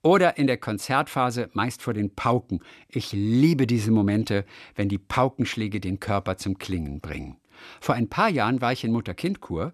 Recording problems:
none

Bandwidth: 13.5 kHz